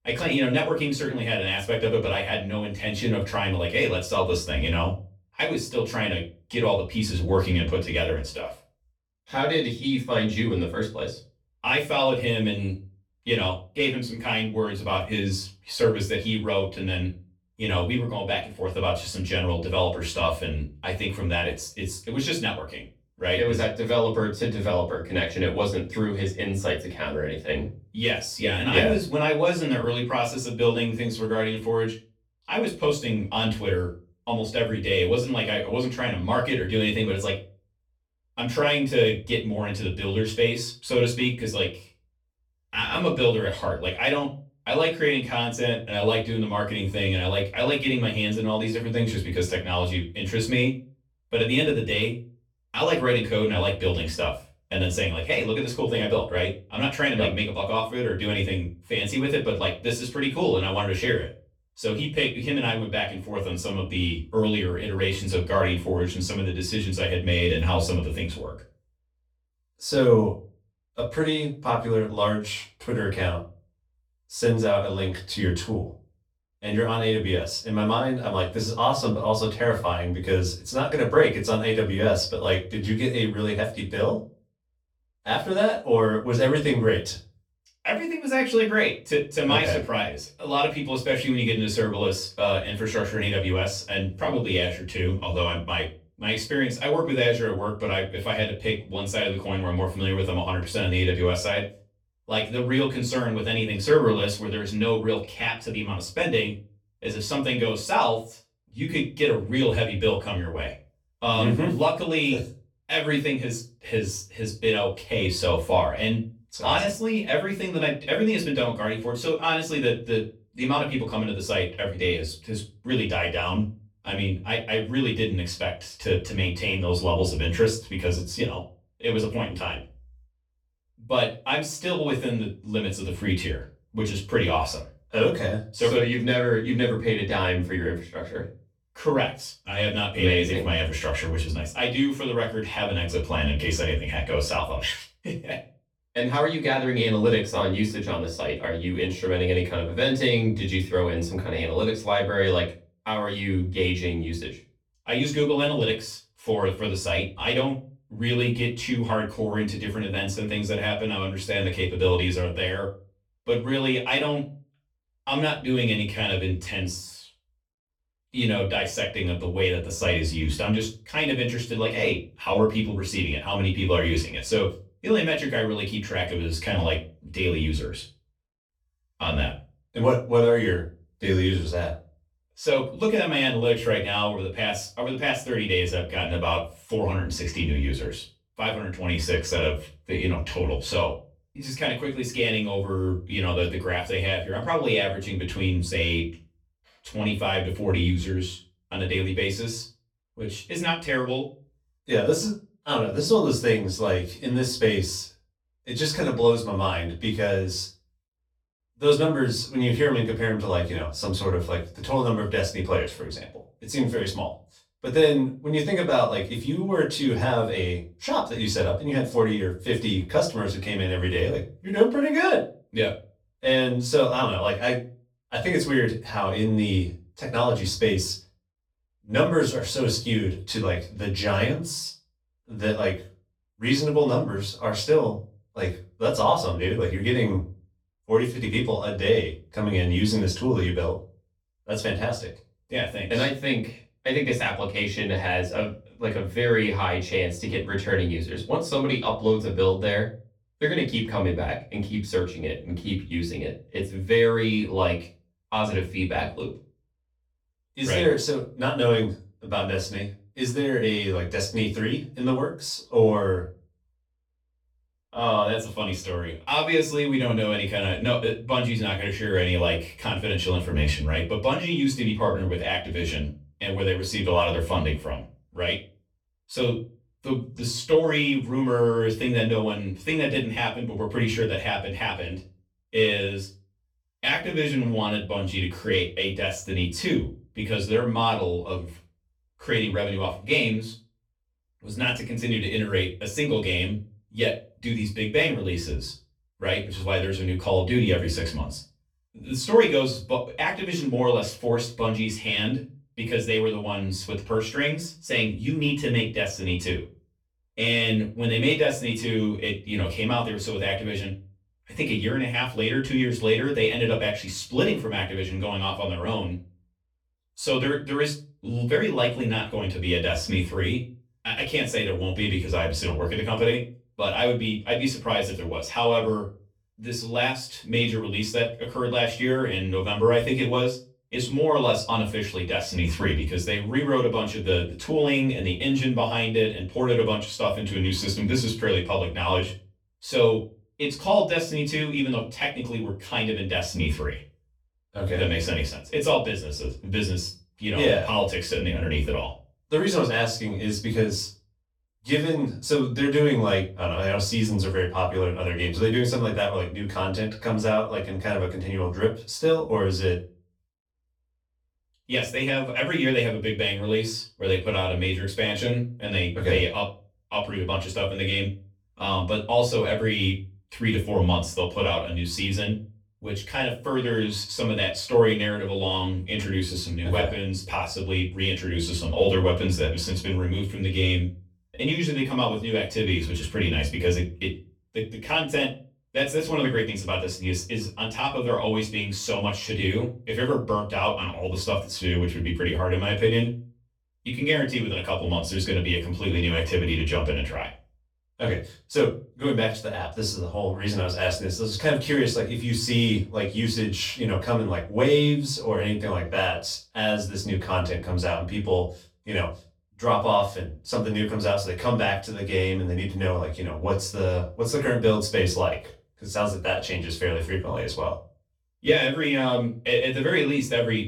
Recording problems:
off-mic speech; far
room echo; slight; dies away in 0.3 s

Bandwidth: 19 kHz